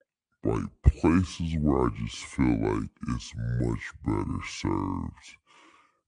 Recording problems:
wrong speed and pitch; too slow and too low; 0.6 times normal speed

